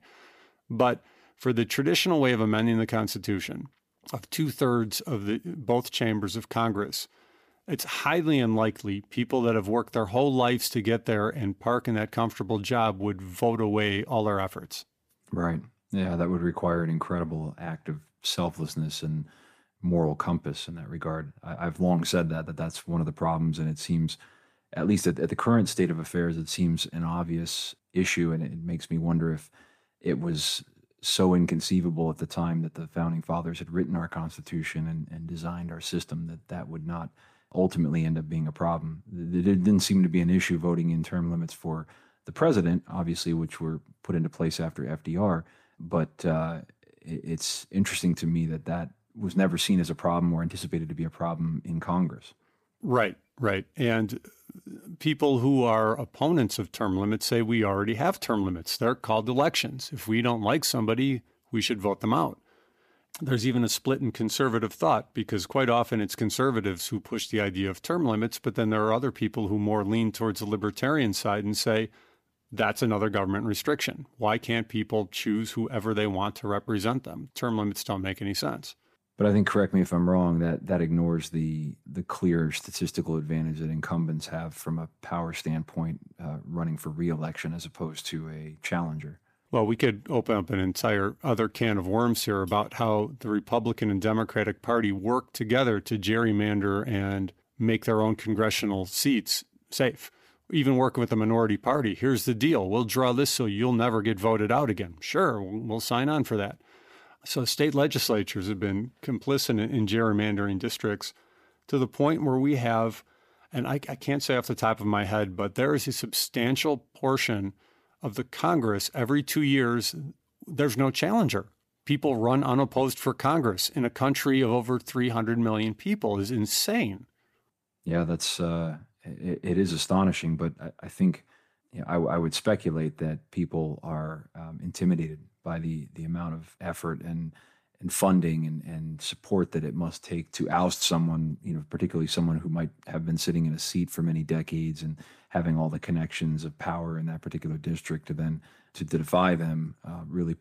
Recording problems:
none

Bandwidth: 15 kHz